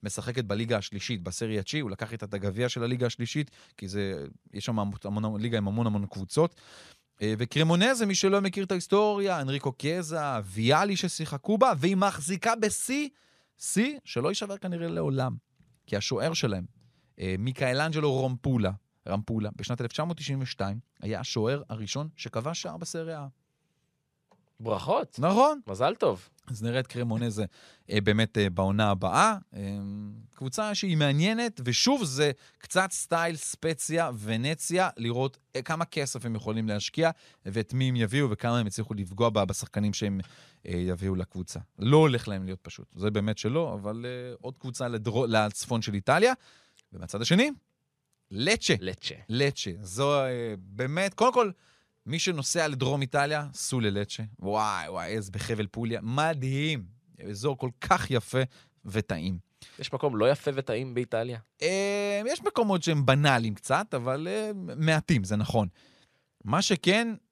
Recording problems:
none

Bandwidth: 13.5 kHz